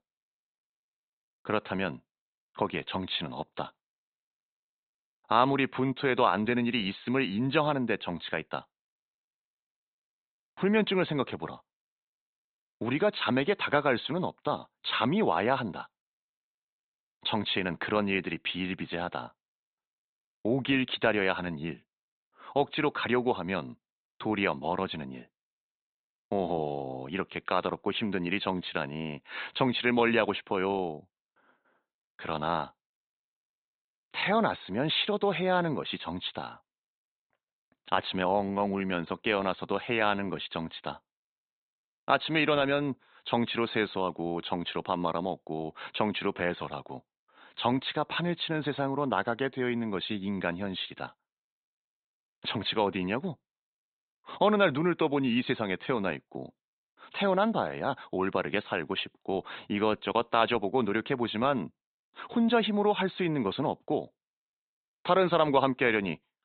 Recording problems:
high frequencies cut off; severe; nothing above 4 kHz

